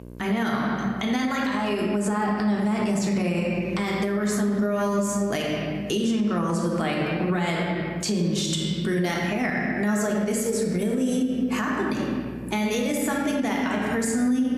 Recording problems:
room echo; noticeable; dies away in 1.4 s
off-mic speech; somewhat distant
squashed, flat; somewhat
electrical hum; faint; throughout; 60 Hz, 25 dB below the speech

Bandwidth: 14.5 kHz